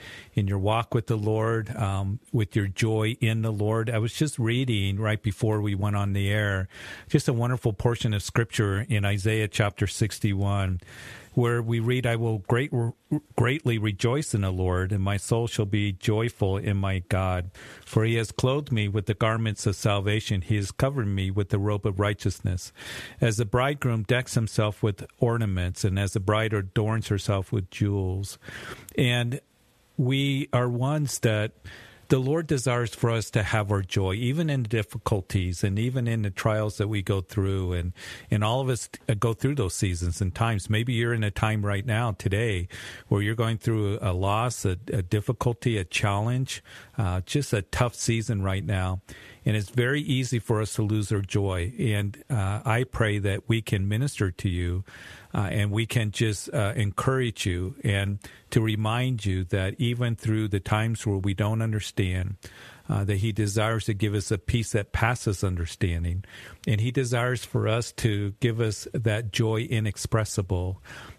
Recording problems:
squashed, flat; somewhat

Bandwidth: 13.5 kHz